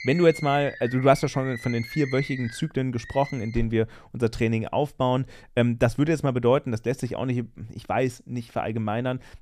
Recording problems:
animal sounds; noticeable; until 3.5 s; 10 dB below the speech

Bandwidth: 14.5 kHz